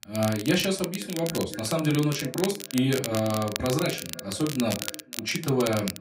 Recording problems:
off-mic speech; far
echo of what is said; faint; throughout; 510 ms later, 20 dB below the speech
room echo; very slight; dies away in 0.2 s
crackle, like an old record; loud; 8 dB below the speech

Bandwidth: 15.5 kHz